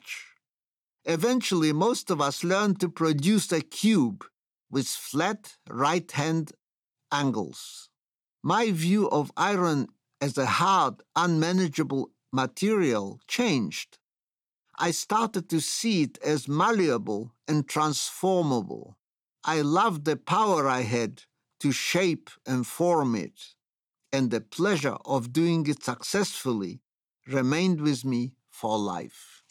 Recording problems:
none

